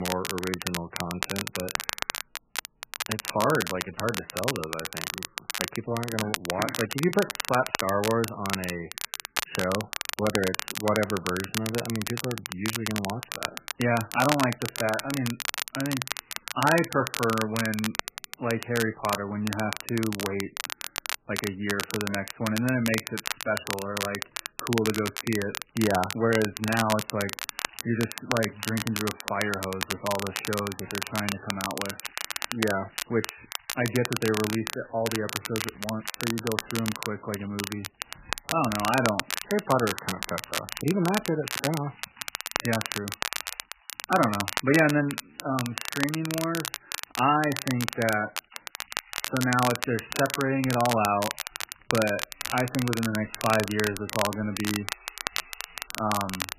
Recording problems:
garbled, watery; badly; nothing above 3 kHz
crackle, like an old record; loud; 4 dB below the speech
household noises; faint; throughout; 20 dB below the speech
abrupt cut into speech; at the start

